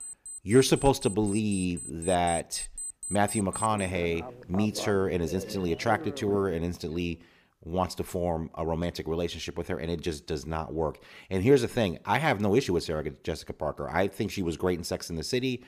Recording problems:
alarms or sirens; loud; until 6.5 s; 10 dB below the speech

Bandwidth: 15 kHz